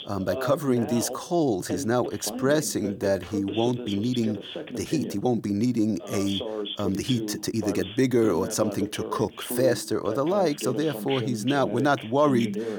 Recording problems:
voice in the background; loud; throughout; 8 dB below the speech
uneven, jittery; strongly; from 0.5 to 11 s

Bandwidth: 18.5 kHz